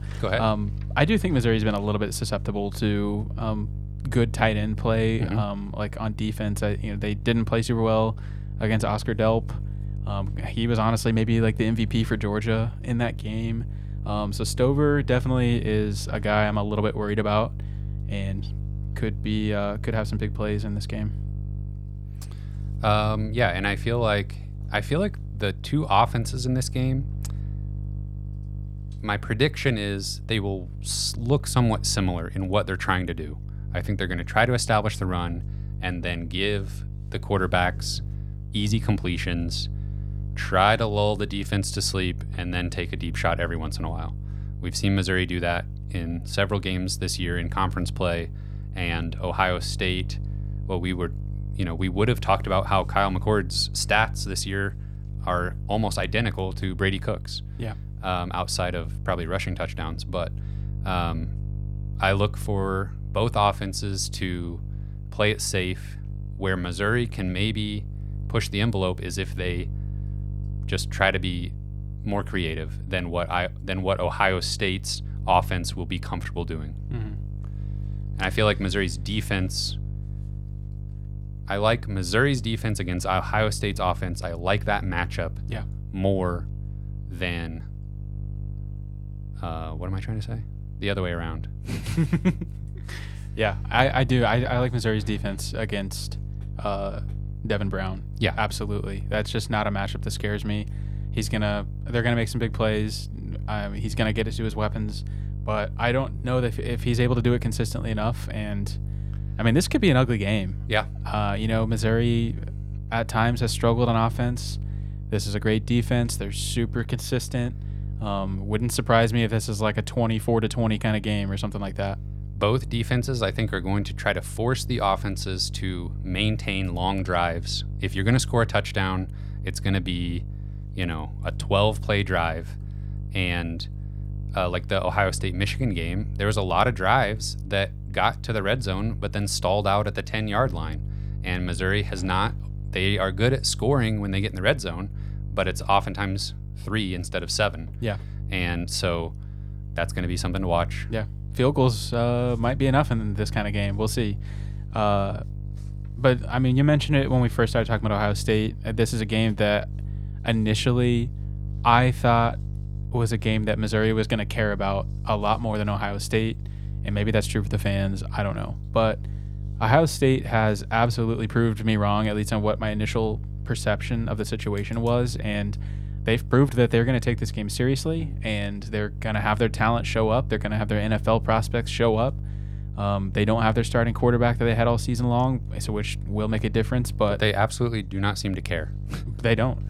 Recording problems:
electrical hum; faint; throughout; 50 Hz, 20 dB below the speech

